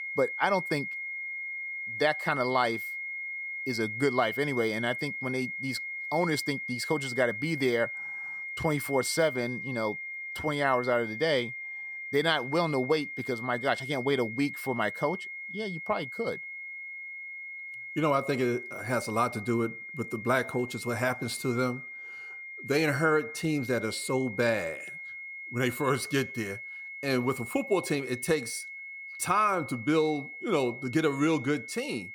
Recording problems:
high-pitched whine; loud; throughout; 2 kHz, 7 dB below the speech

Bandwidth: 17.5 kHz